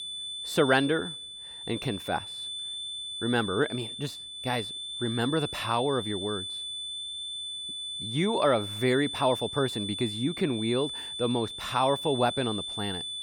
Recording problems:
high-pitched whine; loud; throughout; 3.5 kHz, 5 dB below the speech

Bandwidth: 18.5 kHz